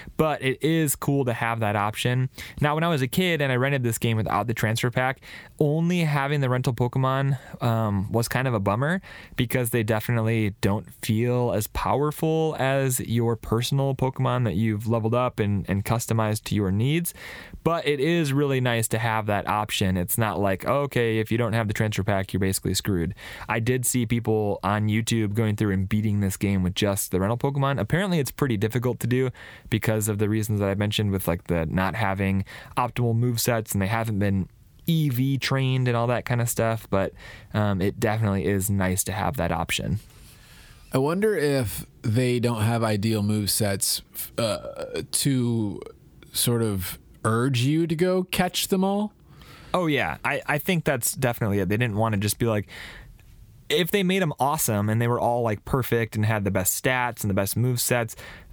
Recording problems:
squashed, flat; somewhat

